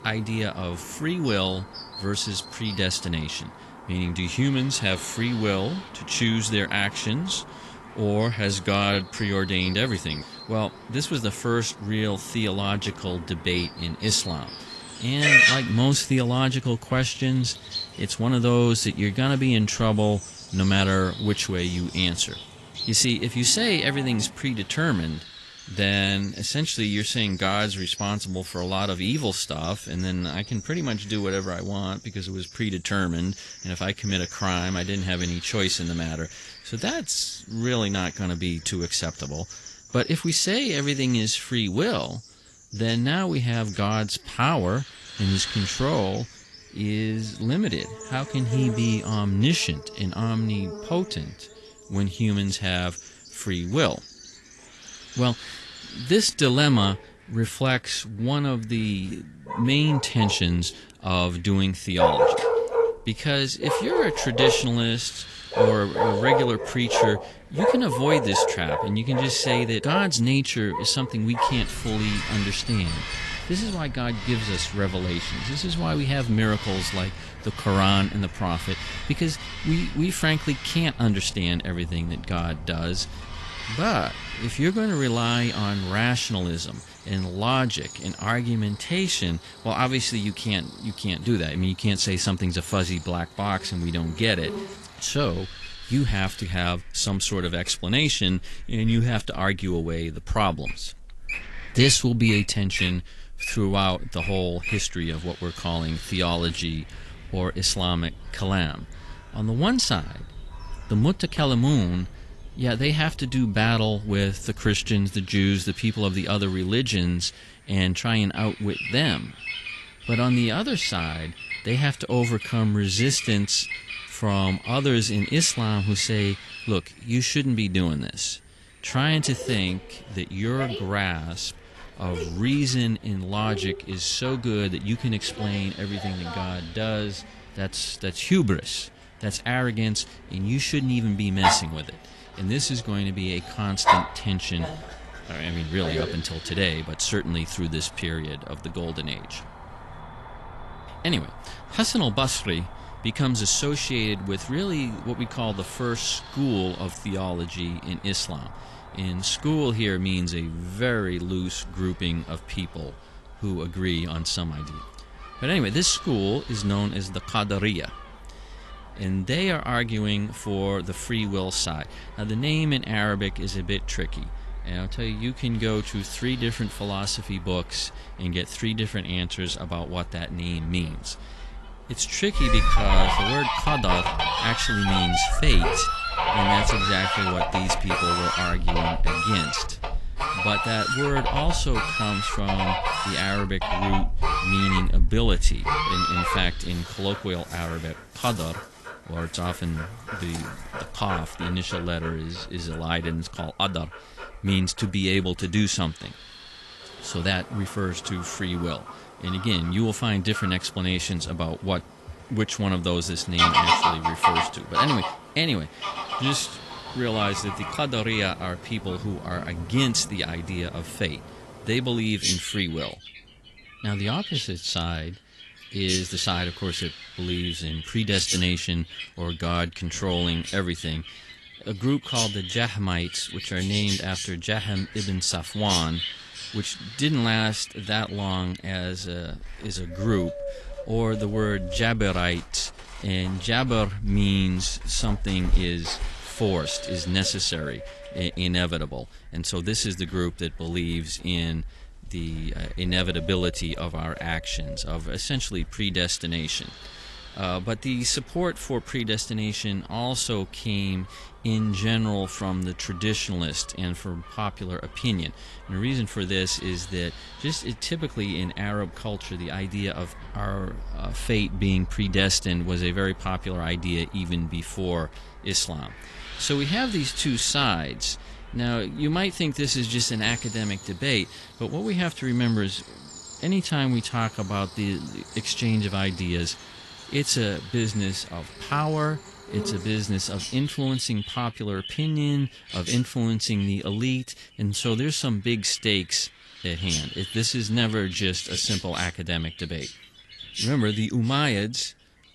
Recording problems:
garbled, watery; slightly; nothing above 11.5 kHz
animal sounds; loud; throughout; 5 dB below the speech
wind noise on the microphone; occasional gusts; 15 dB below the speech

